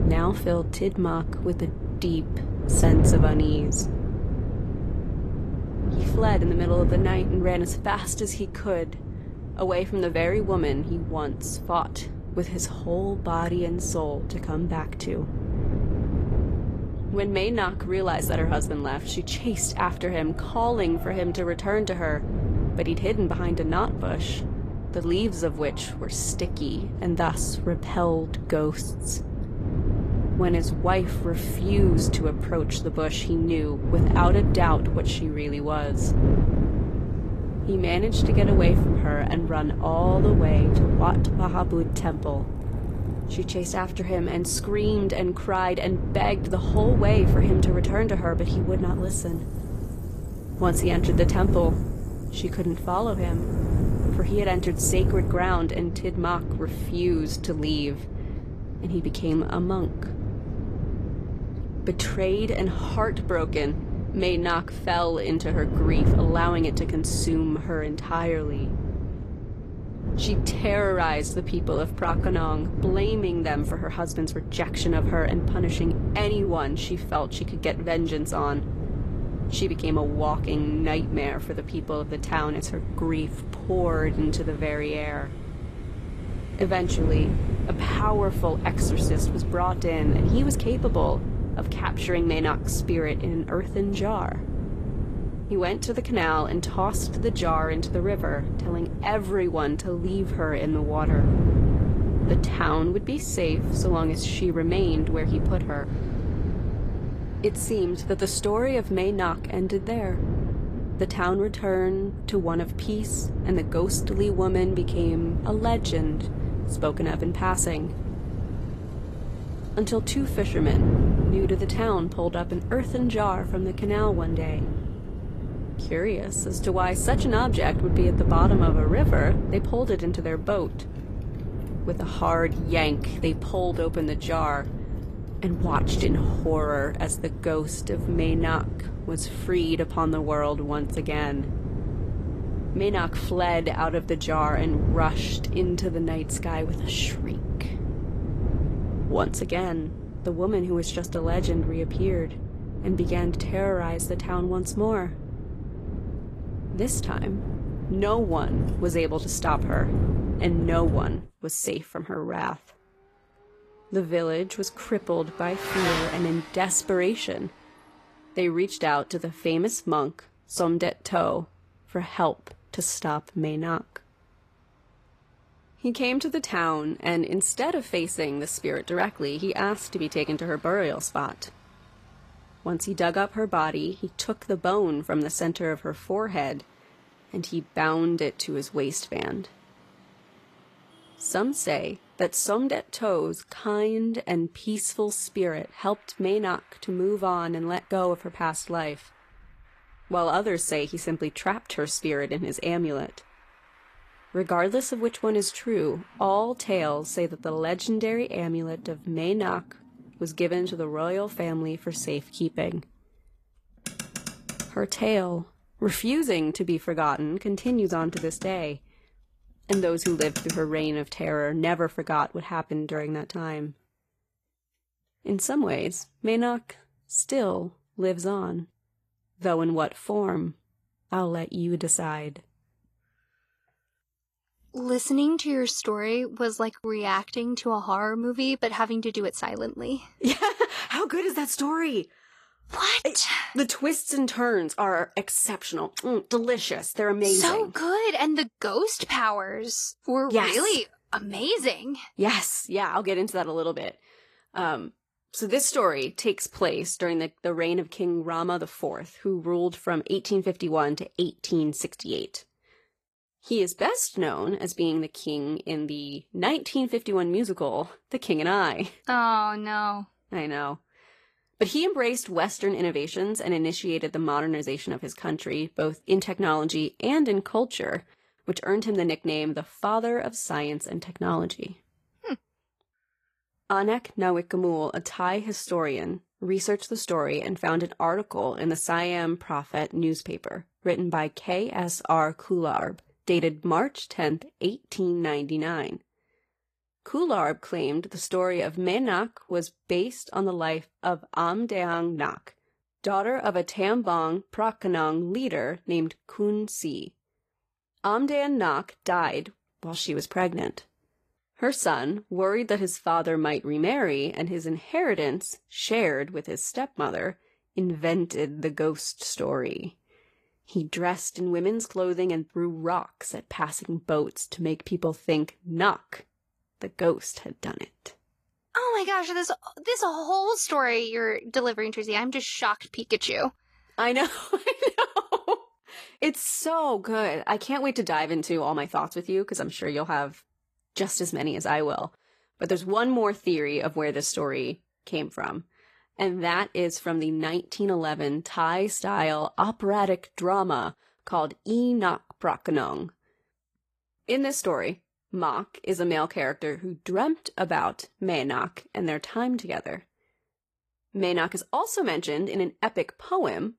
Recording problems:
garbled, watery; slightly; nothing above 14.5 kHz
wind noise on the microphone; heavy; until 2:41; 10 dB below the speech
traffic noise; noticeable; until 3:43; 20 dB below the speech

